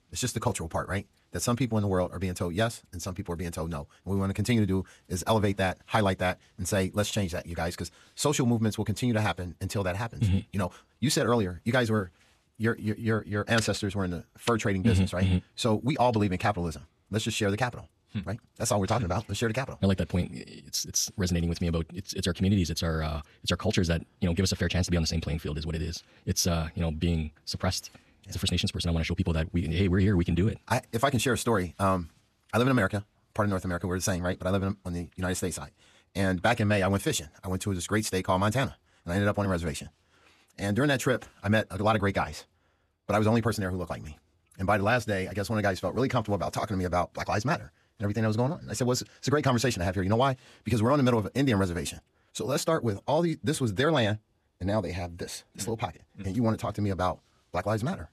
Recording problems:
wrong speed, natural pitch; too fast; 1.6 times normal speed

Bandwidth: 13.5 kHz